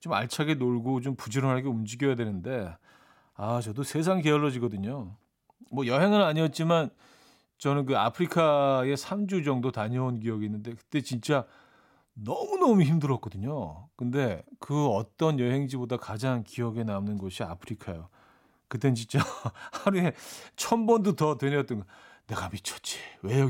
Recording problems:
abrupt cut into speech; at the end

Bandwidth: 16.5 kHz